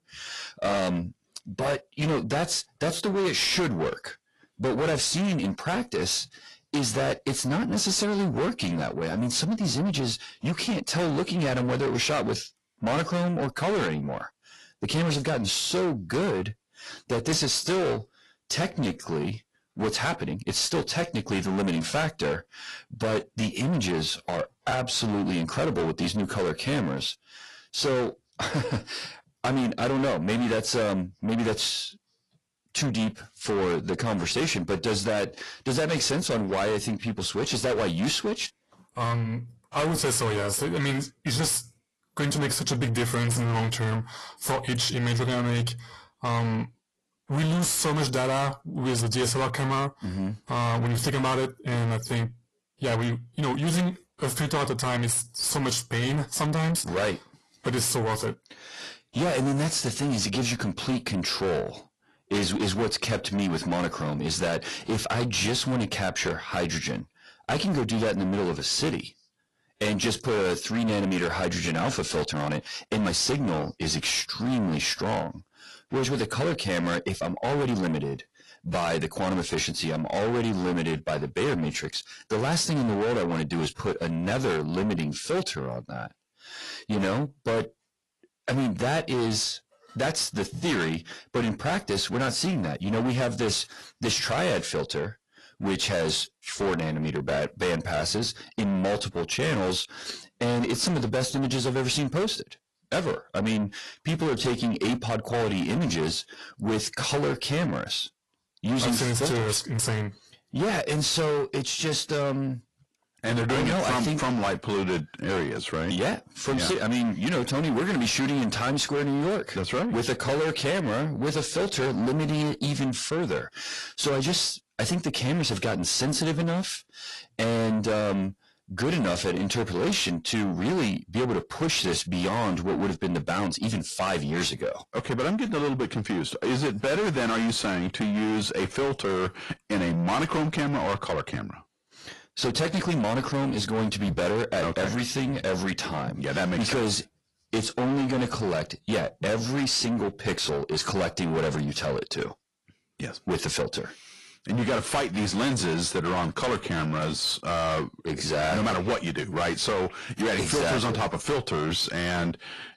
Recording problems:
distortion; heavy; 6 dB below the speech
garbled, watery; slightly; nothing above 11.5 kHz
uneven, jittery; strongly; from 19 s to 2:37

